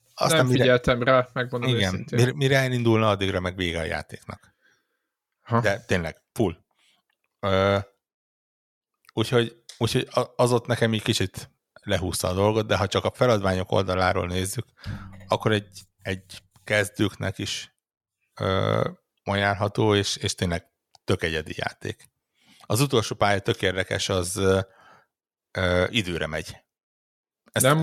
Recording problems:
abrupt cut into speech; at the end

